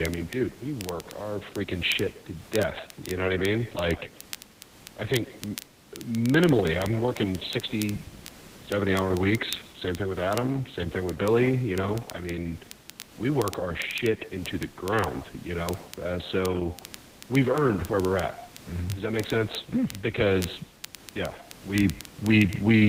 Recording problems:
garbled, watery; badly; nothing above 4 kHz
echo of what is said; faint; throughout; 140 ms later, 20 dB below the speech
crackle, like an old record; noticeable; 15 dB below the speech
hiss; faint; throughout; 20 dB below the speech
abrupt cut into speech; at the start and the end

